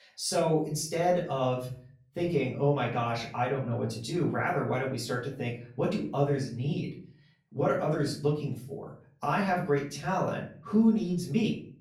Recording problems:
off-mic speech; far
room echo; slight; dies away in 0.4 s

